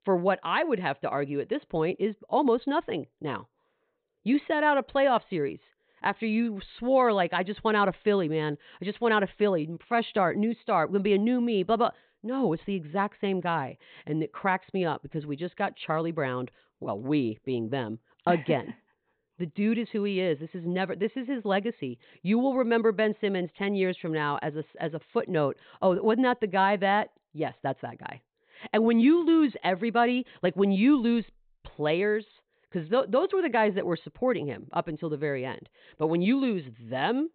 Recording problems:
high frequencies cut off; severe; nothing above 4 kHz

